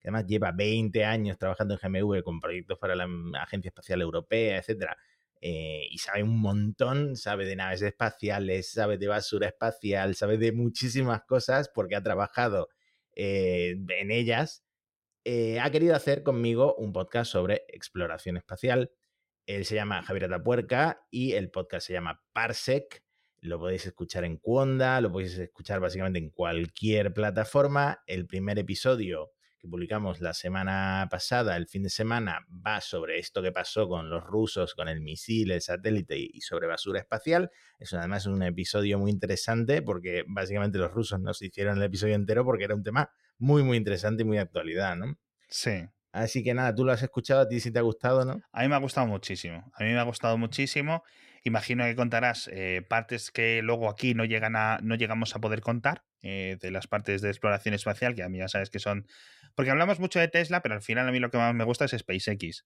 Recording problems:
none

